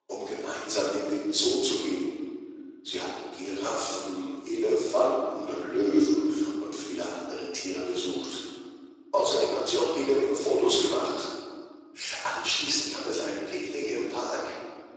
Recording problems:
room echo; strong; dies away in 1.7 s
off-mic speech; far
thin; somewhat; fading below 300 Hz
garbled, watery; slightly; nothing above 7.5 kHz

